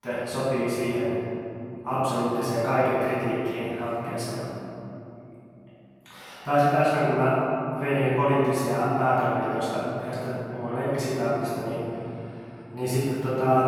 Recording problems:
room echo; strong; dies away in 3 s
off-mic speech; far

